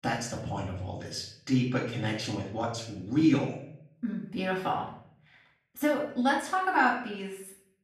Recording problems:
off-mic speech; far
room echo; noticeable; dies away in 0.6 s

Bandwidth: 13.5 kHz